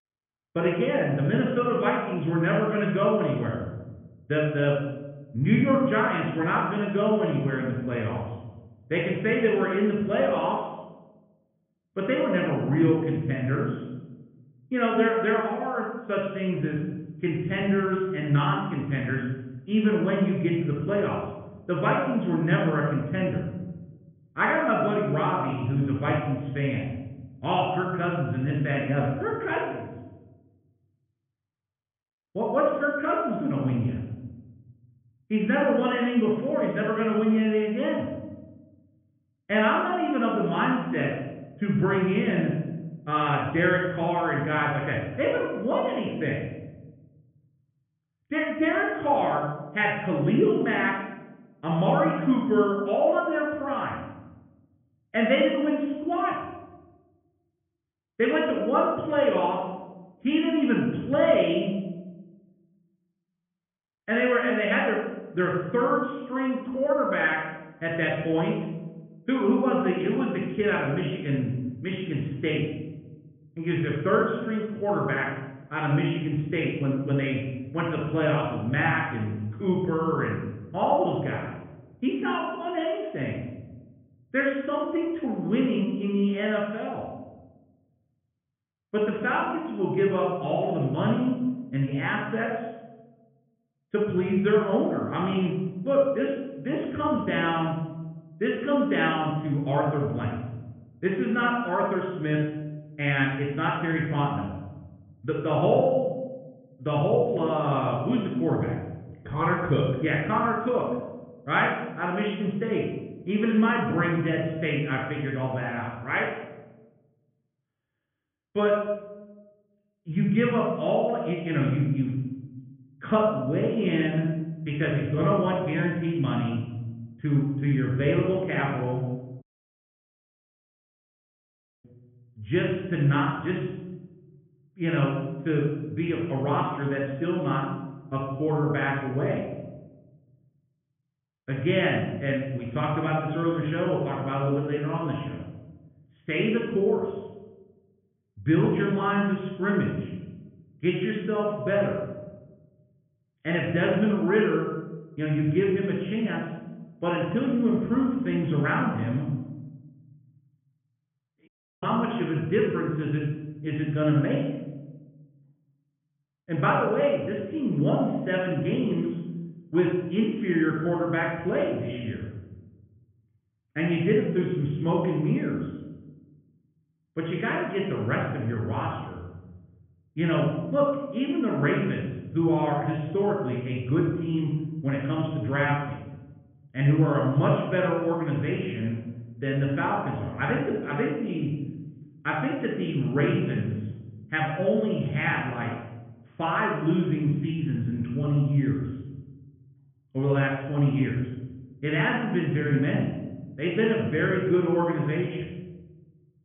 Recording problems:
off-mic speech; far
high frequencies cut off; severe; nothing above 3.5 kHz
room echo; noticeable; dies away in 1.1 s
muffled; very slightly; fading above 3.5 kHz
audio cutting out; at 2:09 for 2.5 s and at 2:41

